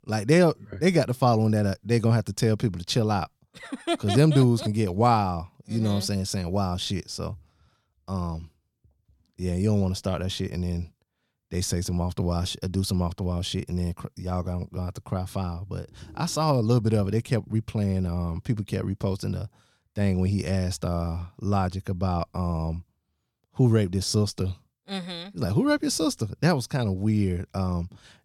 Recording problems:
none

